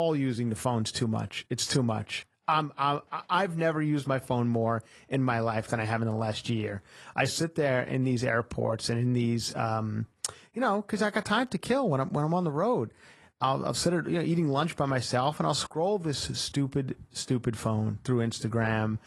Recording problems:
garbled, watery; slightly; nothing above 11 kHz
abrupt cut into speech; at the start

